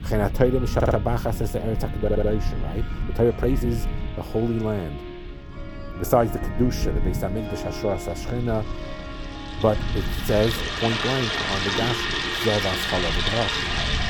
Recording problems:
household noises; very loud; throughout; 1 dB above the speech
background music; noticeable; throughout; 15 dB below the speech
low rumble; noticeable; throughout; 20 dB below the speech
audio stuttering; at 1 s and at 2 s
uneven, jittery; strongly; from 3 to 11 s

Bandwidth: 18.5 kHz